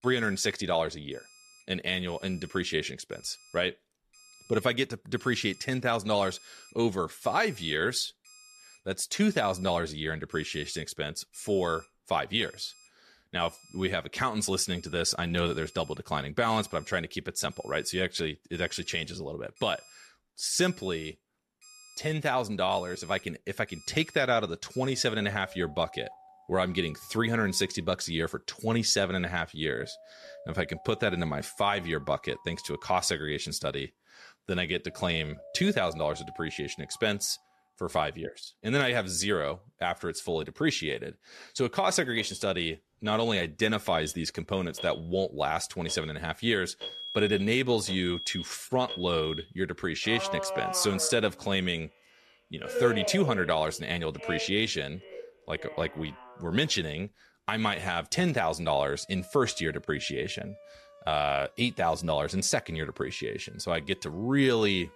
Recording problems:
alarms or sirens; noticeable; throughout; 15 dB below the speech

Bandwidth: 13.5 kHz